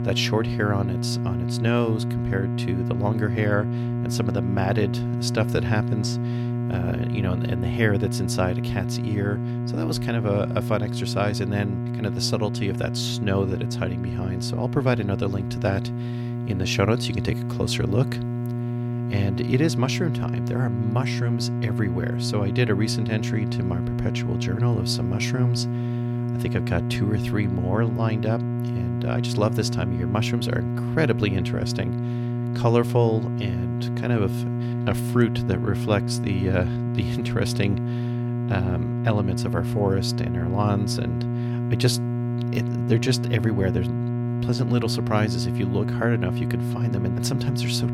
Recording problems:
electrical hum; loud; throughout; 60 Hz, 6 dB below the speech

